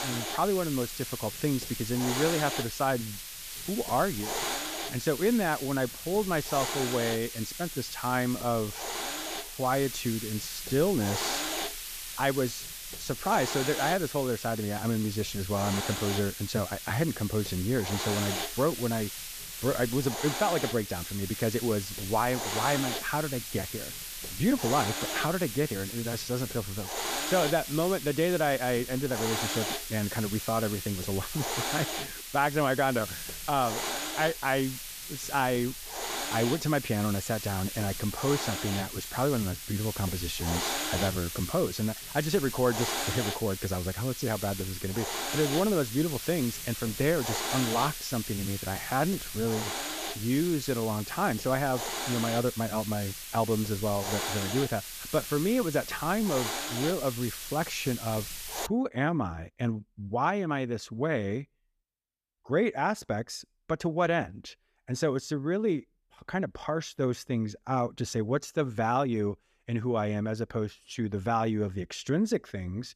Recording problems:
hiss; loud; until 59 s; 4 dB below the speech

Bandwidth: 14.5 kHz